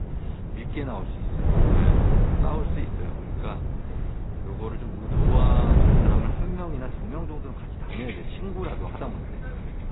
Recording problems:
garbled, watery; badly; nothing above 4 kHz
wind noise on the microphone; heavy; 3 dB above the speech
traffic noise; noticeable; throughout; 10 dB below the speech

